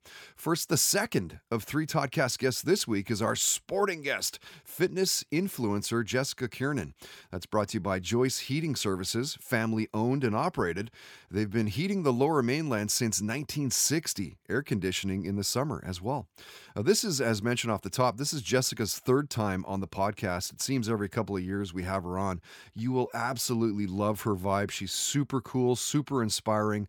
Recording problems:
none

